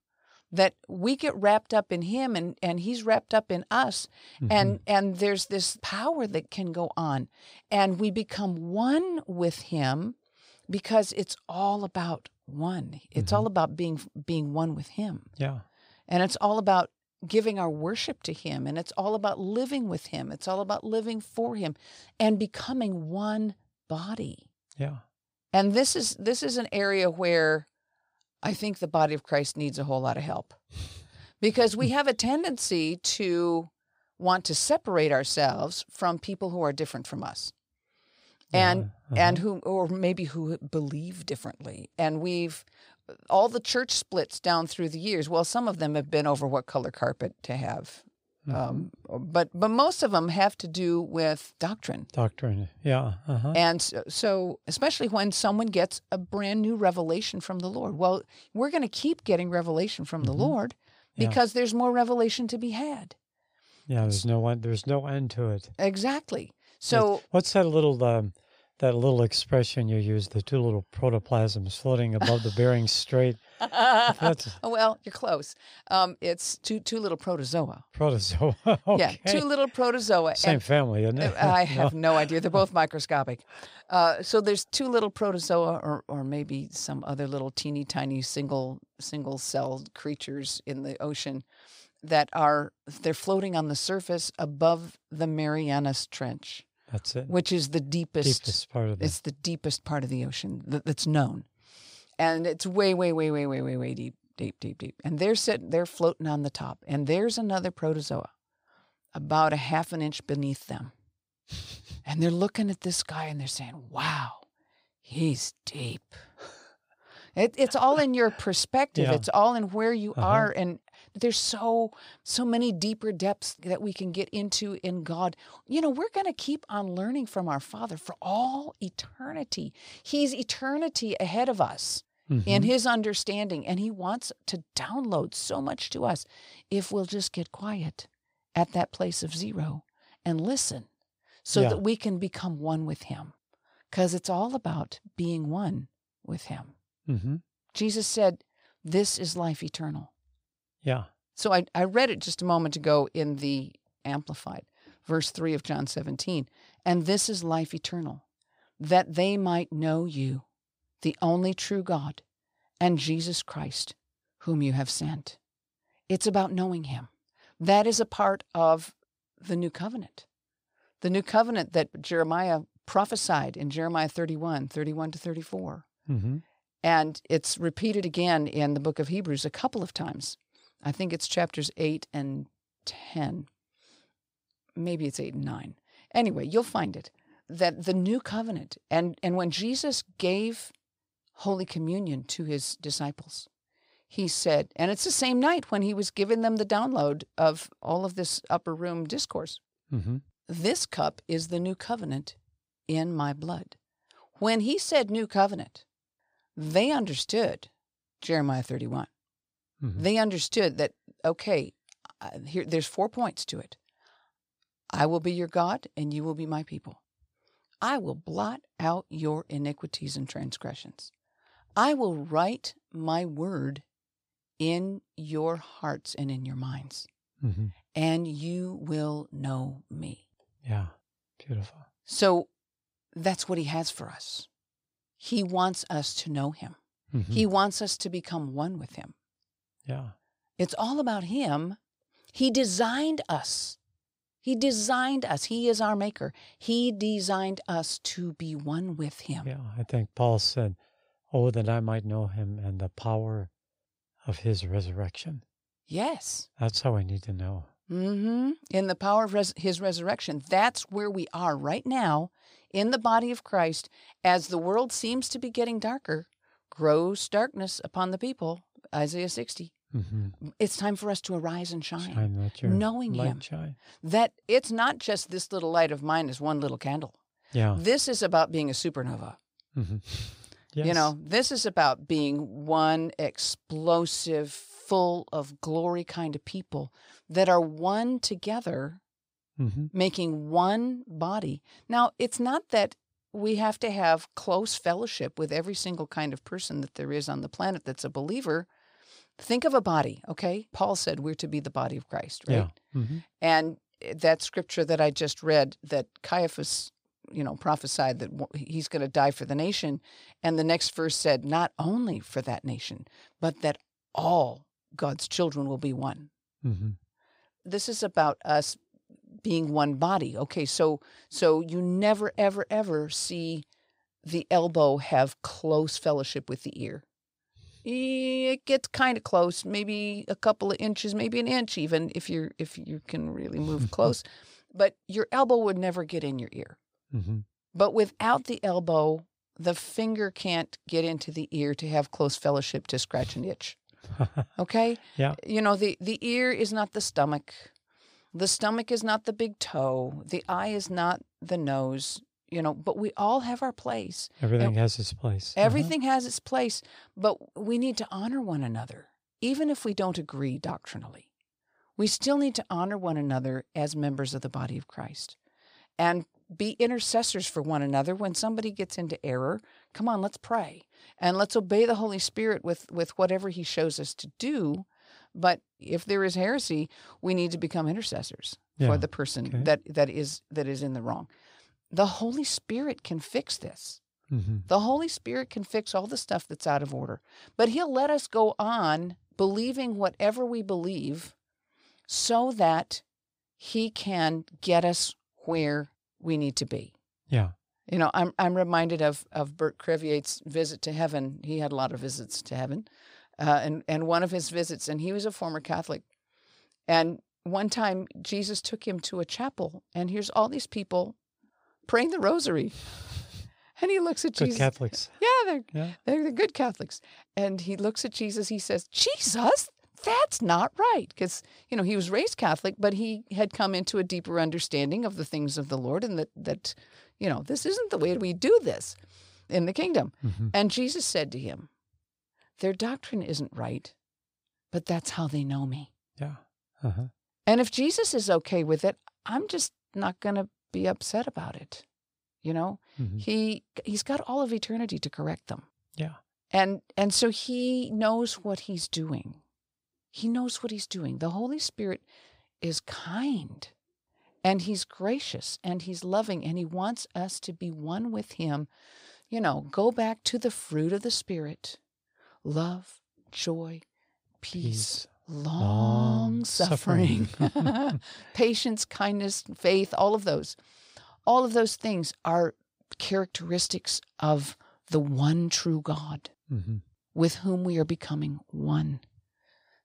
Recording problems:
none

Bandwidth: 15.5 kHz